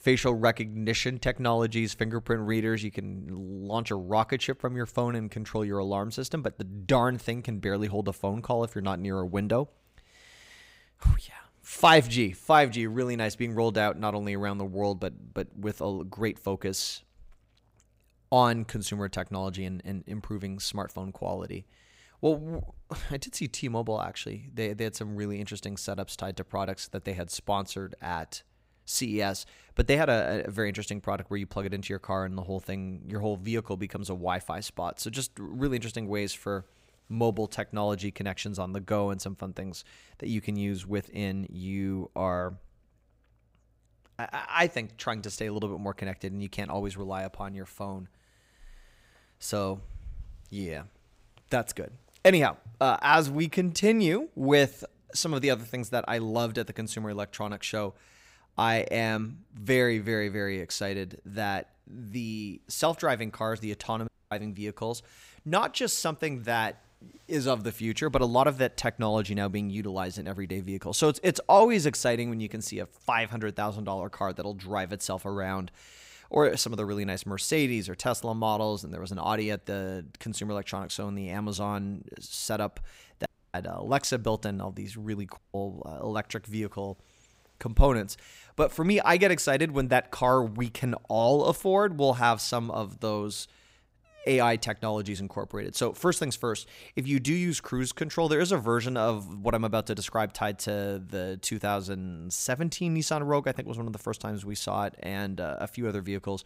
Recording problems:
audio cutting out; at 1:04, at 1:23 and at 1:25

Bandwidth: 15.5 kHz